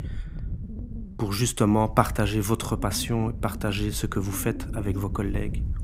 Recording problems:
wind noise on the microphone; occasional gusts; 15 dB below the speech

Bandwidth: 15.5 kHz